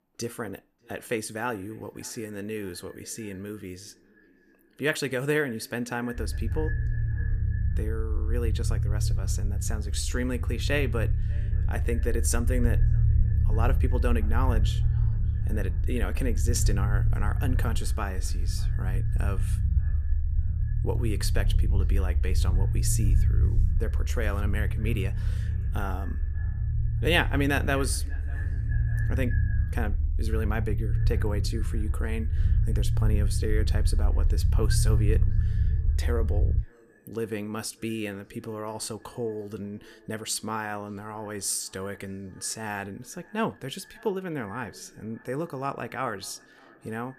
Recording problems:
echo of what is said; faint; throughout; 590 ms later, 20 dB below the speech
low rumble; noticeable; from 6 to 37 s; 10 dB below the speech

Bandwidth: 14.5 kHz